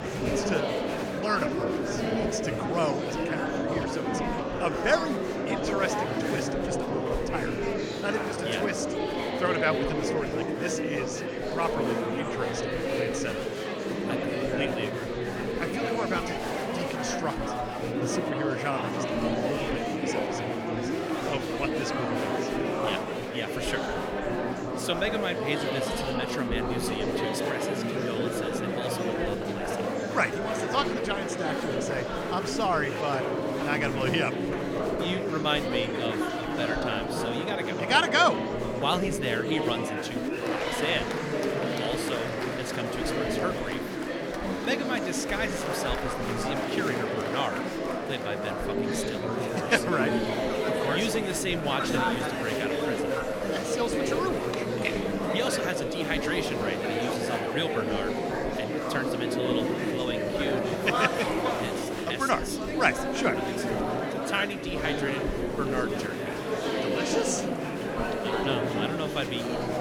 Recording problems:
murmuring crowd; very loud; throughout; 2 dB above the speech

